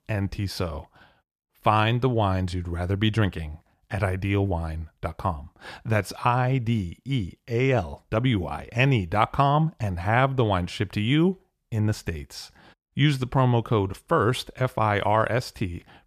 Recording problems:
none

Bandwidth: 14.5 kHz